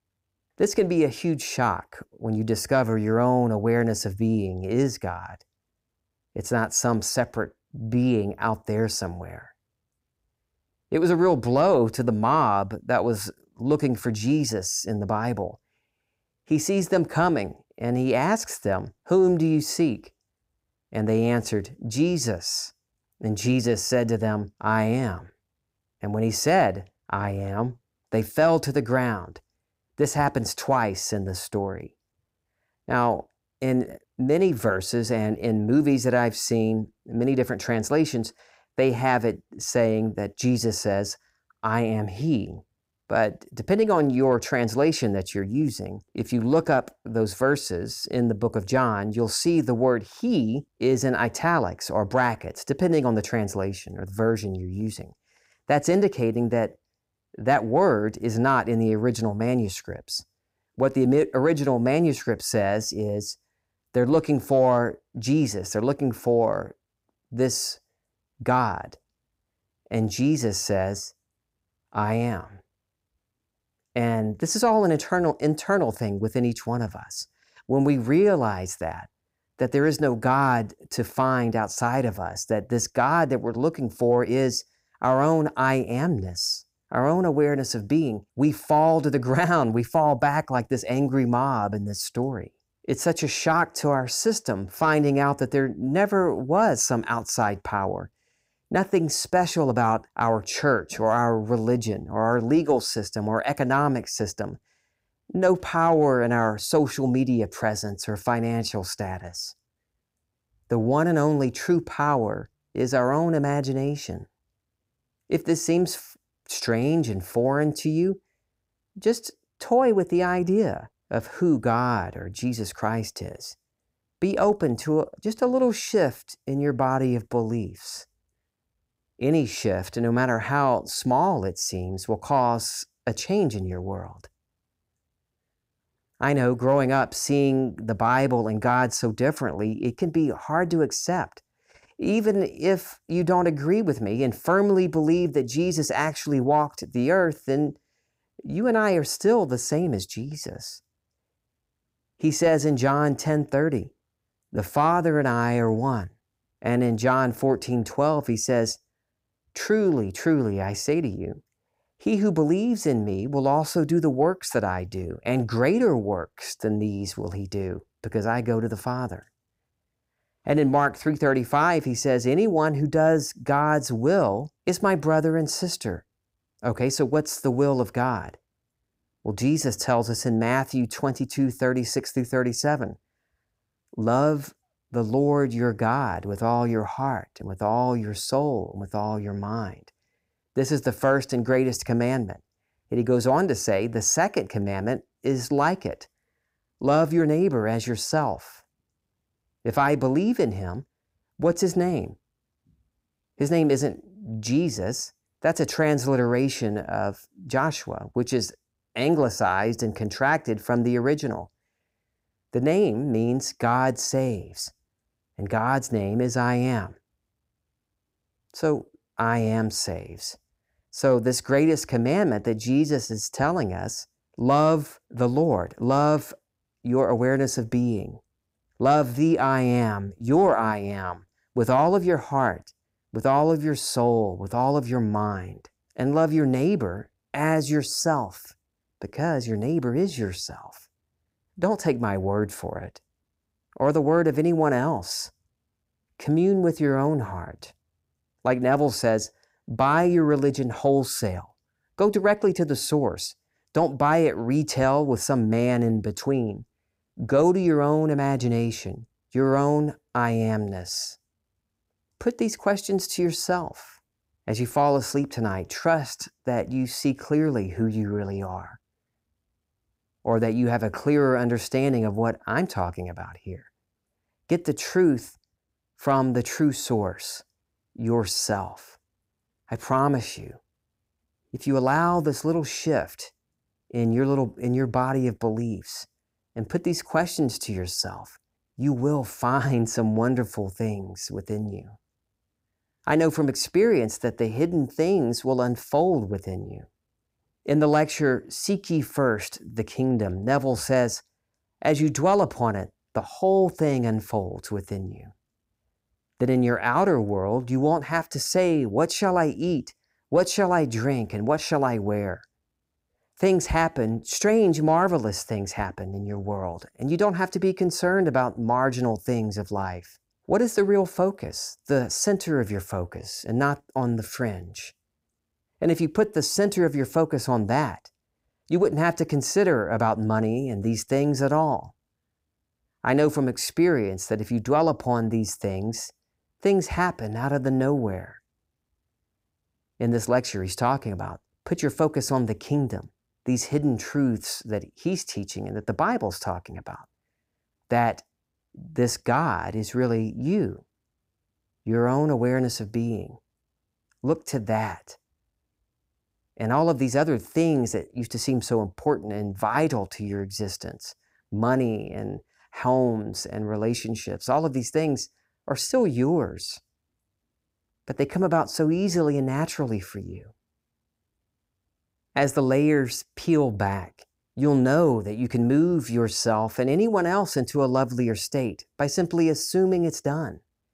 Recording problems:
none

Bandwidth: 15.5 kHz